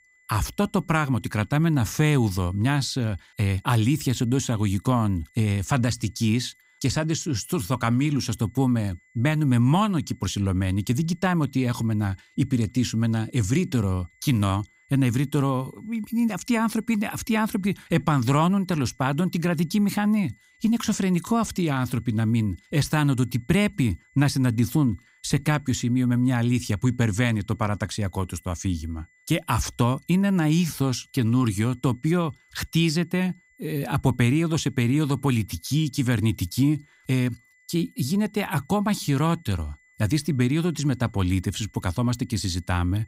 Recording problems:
high-pitched whine; faint; throughout; 2 kHz, 35 dB below the speech

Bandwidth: 15.5 kHz